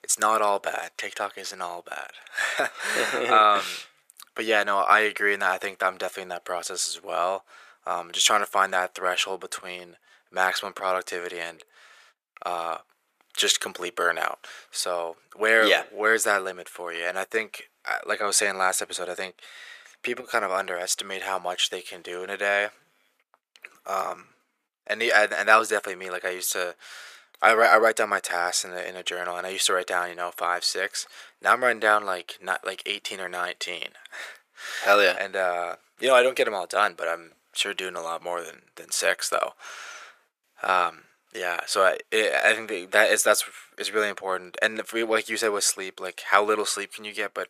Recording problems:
thin; very; fading below 500 Hz

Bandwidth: 14.5 kHz